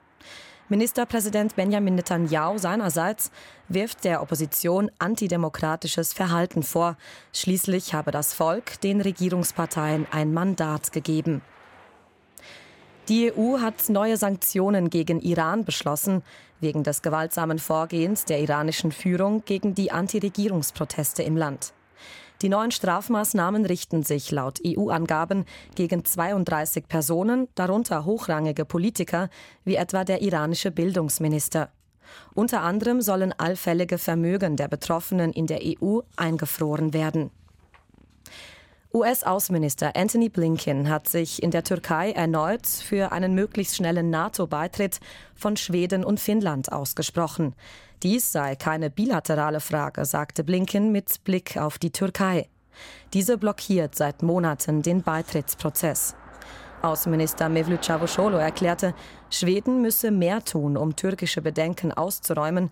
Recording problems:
traffic noise; faint; throughout; 25 dB below the speech

